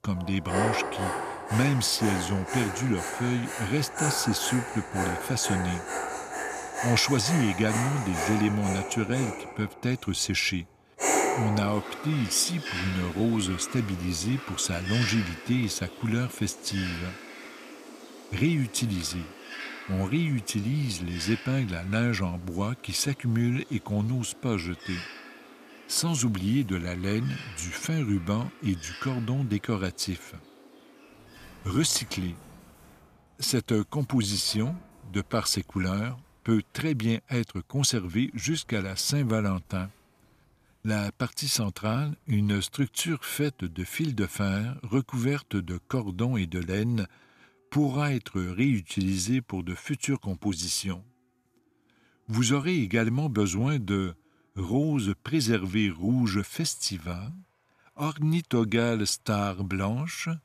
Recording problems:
animal sounds; loud; throughout; 6 dB below the speech

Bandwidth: 14.5 kHz